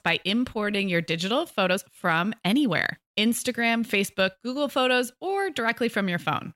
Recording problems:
uneven, jittery; strongly; from 0.5 to 5.5 s

